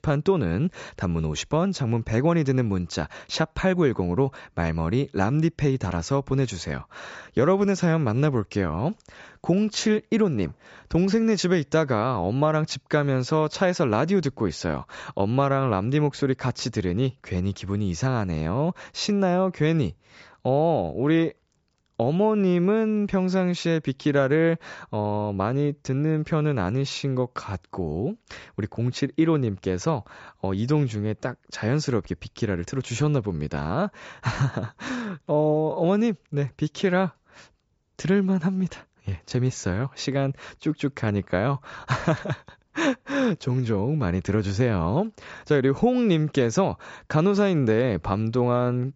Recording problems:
high frequencies cut off; noticeable; nothing above 8 kHz

